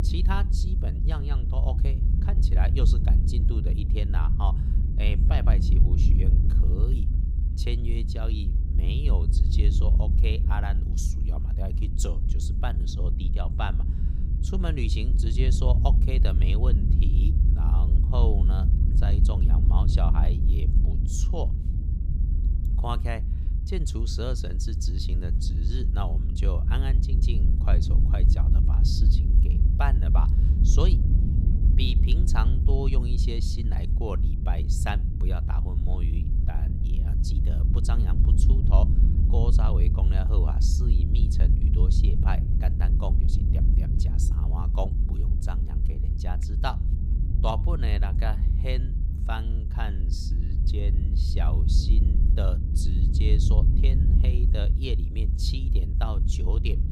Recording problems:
low rumble; loud; throughout; 4 dB below the speech

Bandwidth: 15.5 kHz